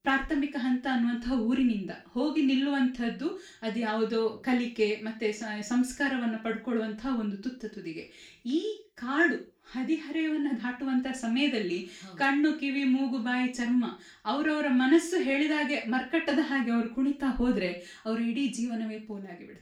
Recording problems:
off-mic speech; far
room echo; slight; dies away in 0.3 s

